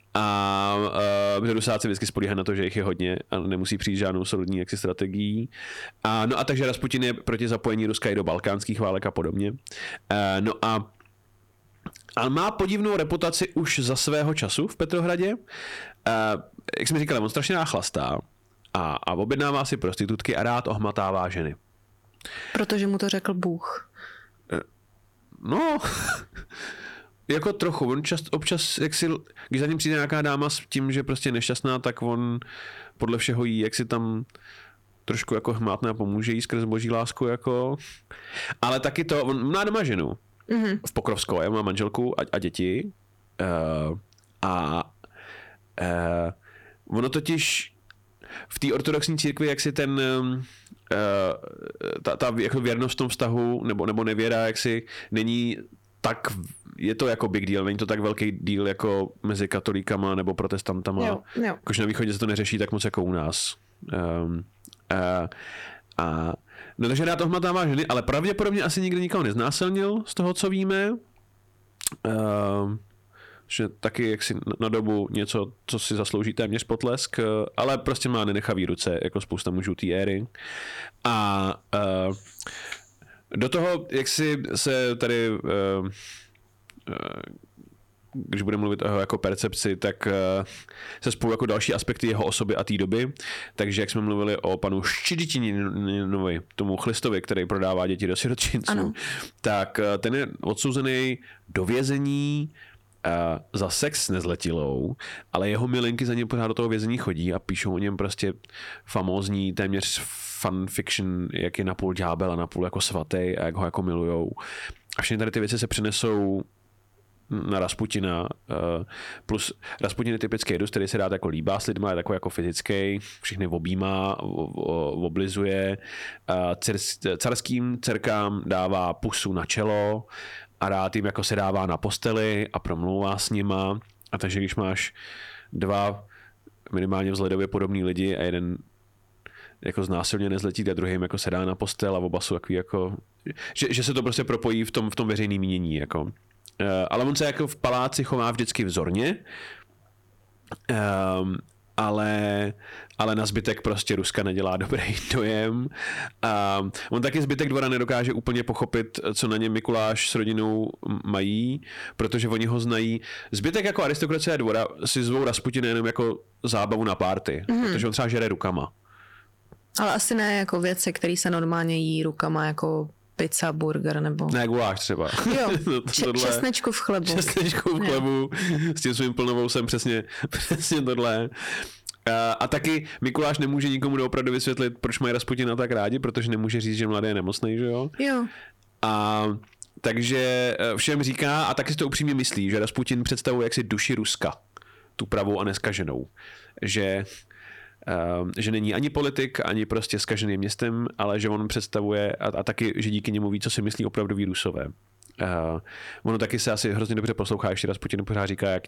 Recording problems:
distortion; slight; 4% of the sound clipped
squashed, flat; somewhat

